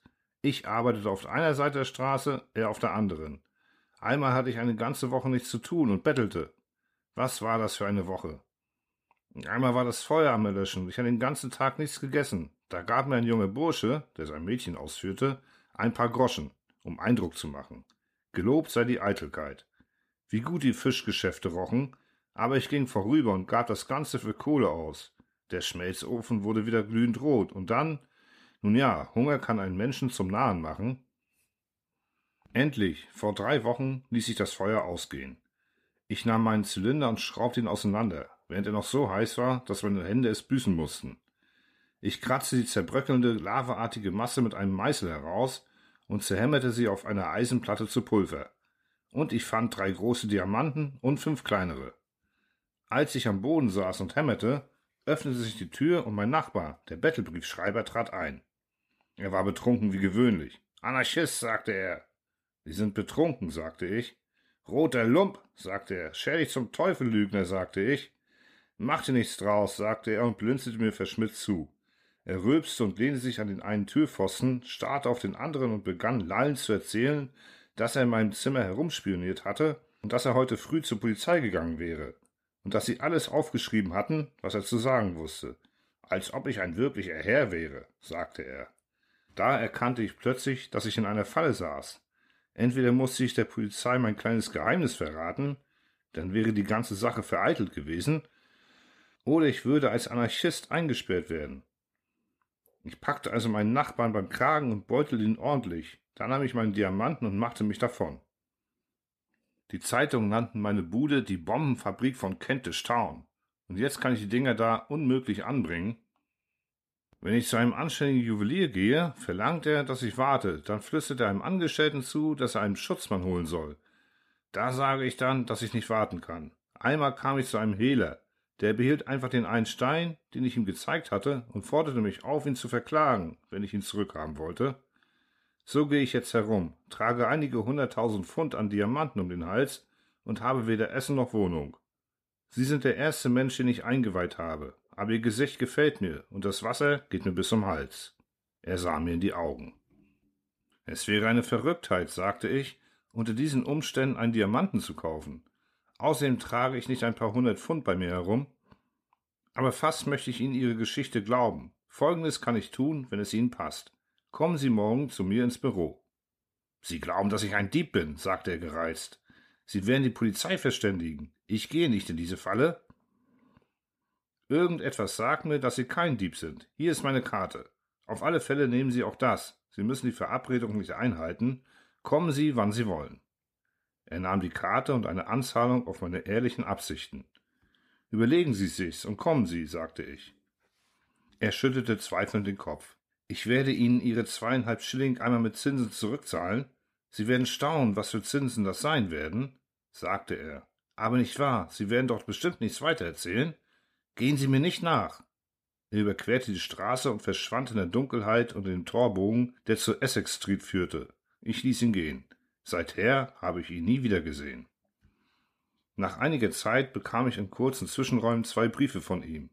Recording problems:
none

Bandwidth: 14.5 kHz